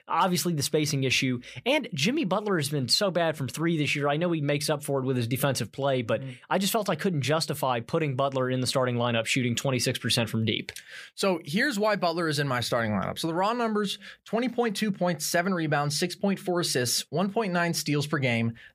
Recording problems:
none

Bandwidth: 15 kHz